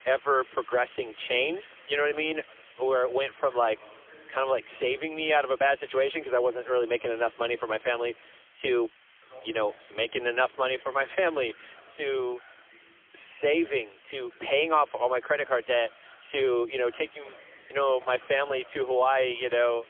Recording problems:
phone-call audio; poor line; nothing above 3.5 kHz
thin; very; fading below 300 Hz
voice in the background; faint; throughout; 25 dB below the speech
hiss; faint; throughout; 25 dB below the speech

